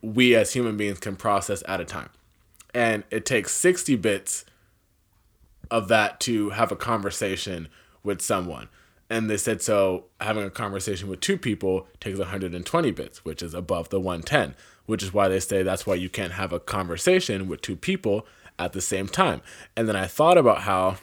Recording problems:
none

